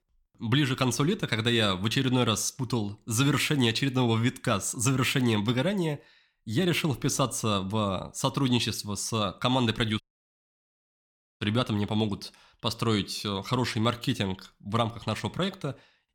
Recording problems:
audio cutting out; at 10 s for 1.5 s

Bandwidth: 17 kHz